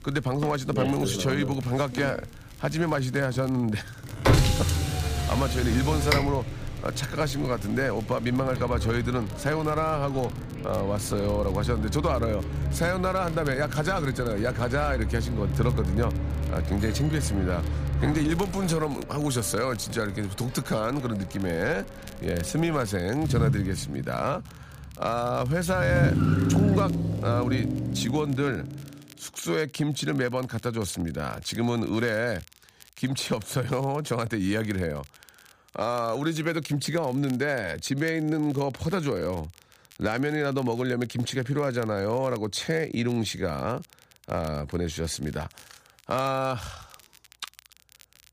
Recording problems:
traffic noise; loud; until 29 s; 2 dB below the speech
crackle, like an old record; faint; 25 dB below the speech

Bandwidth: 15 kHz